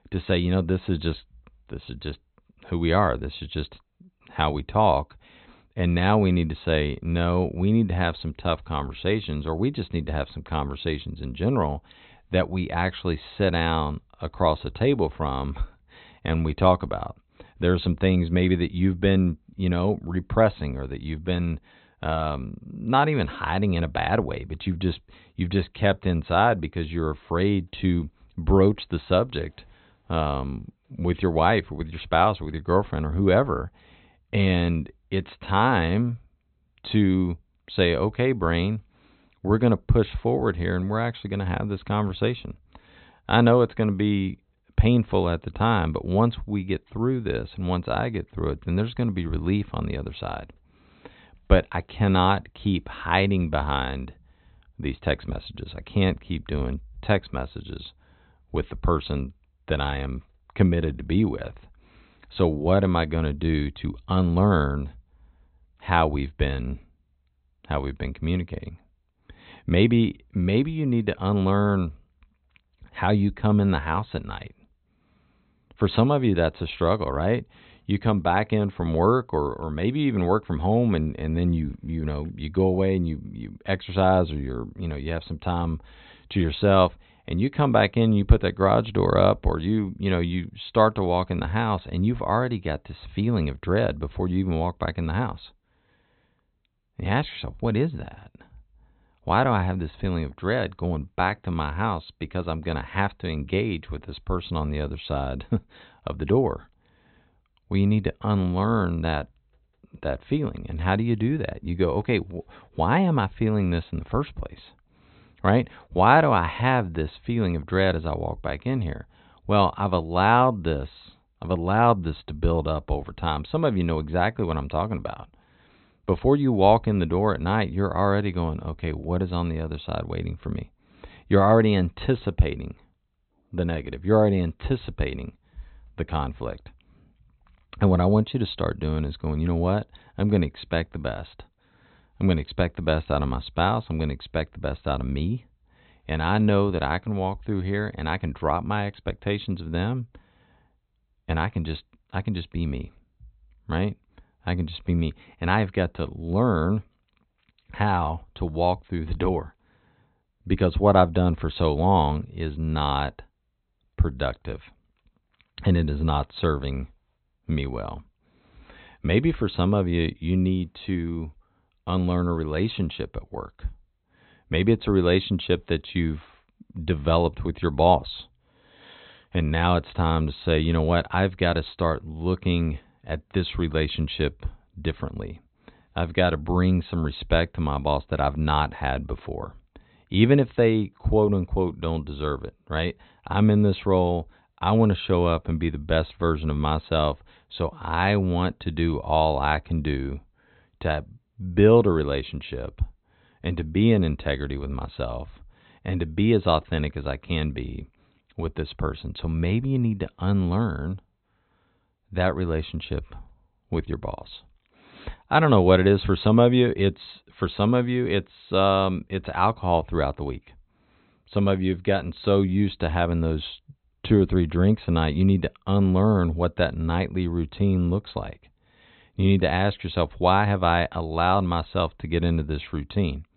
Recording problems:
high frequencies cut off; severe; nothing above 4 kHz

